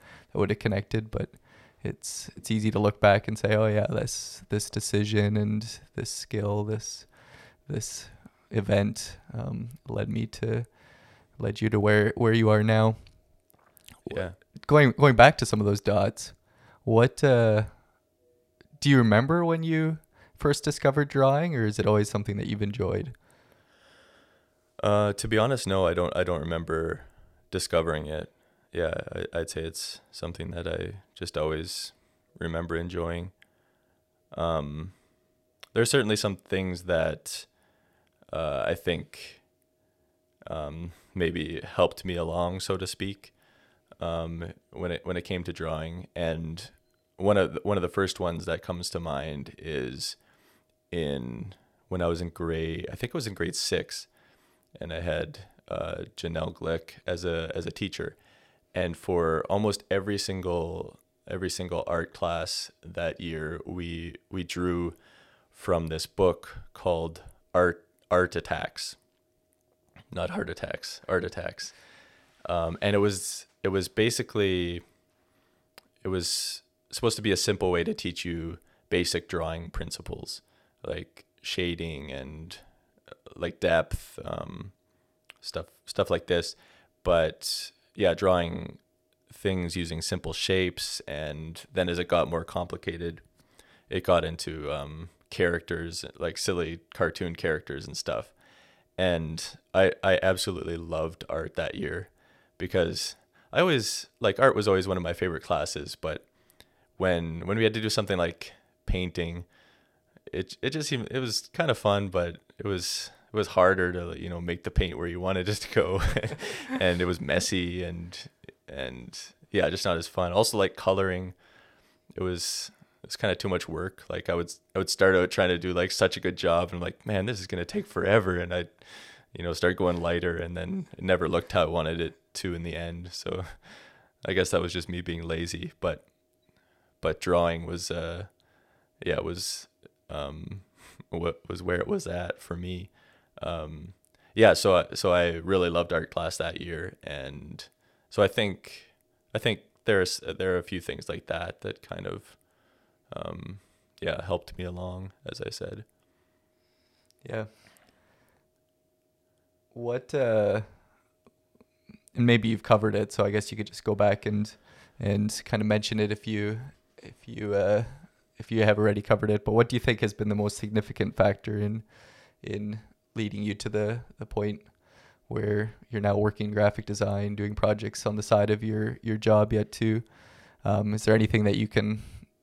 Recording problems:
none

